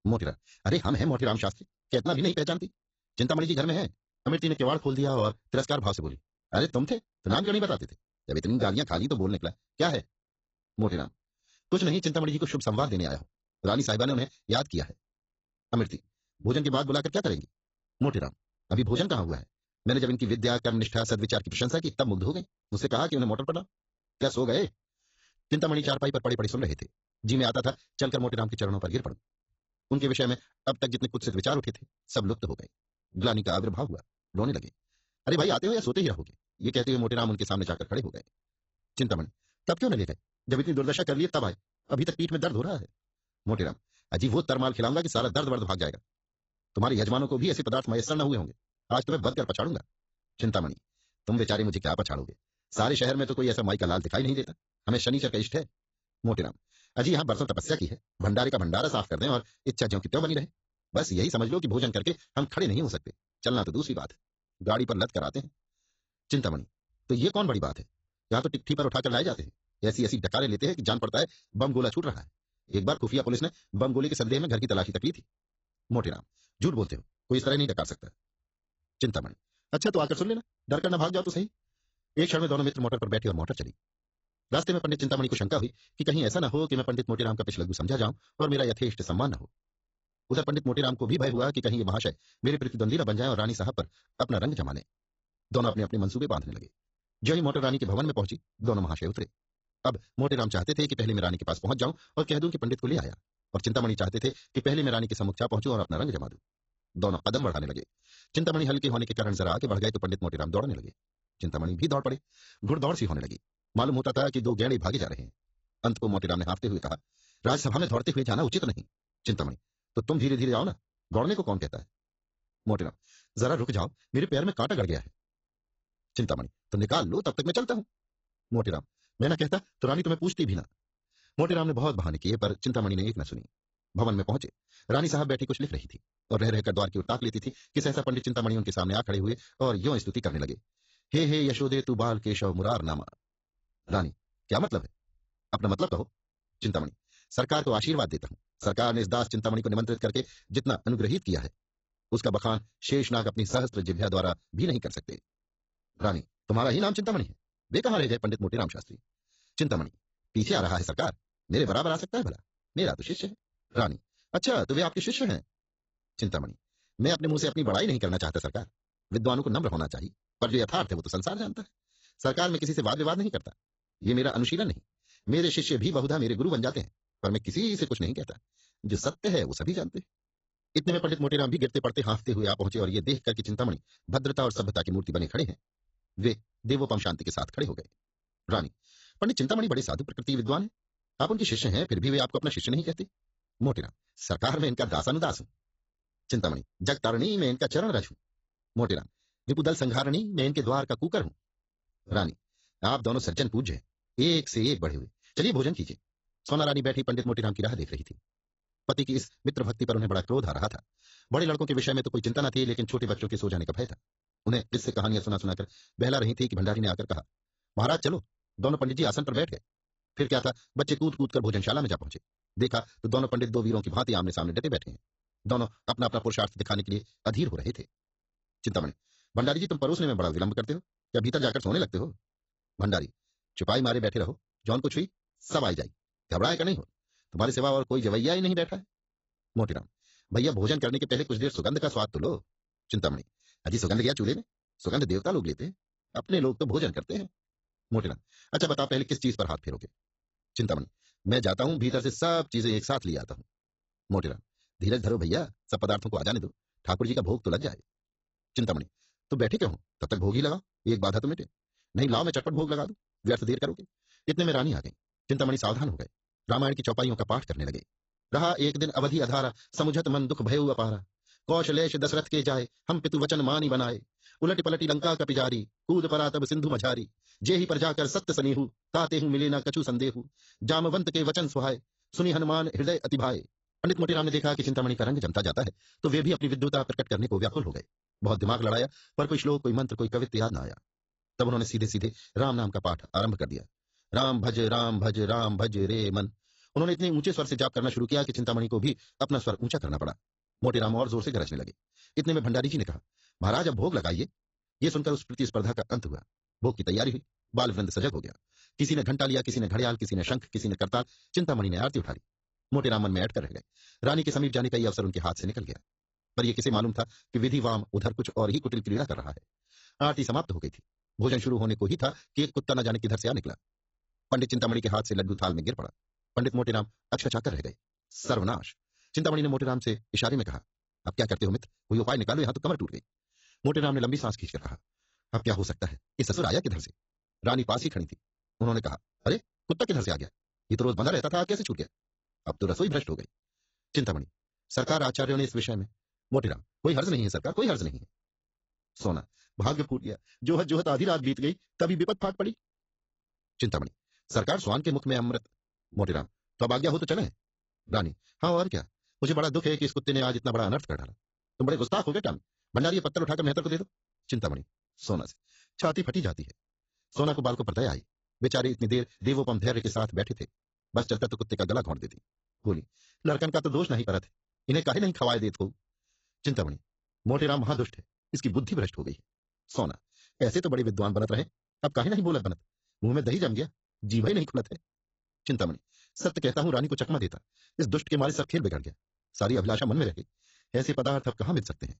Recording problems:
garbled, watery; badly; nothing above 7.5 kHz
wrong speed, natural pitch; too fast; 1.6 times normal speed

